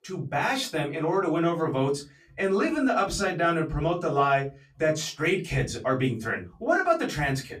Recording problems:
off-mic speech; far
room echo; very slight; dies away in 0.2 s

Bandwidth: 14.5 kHz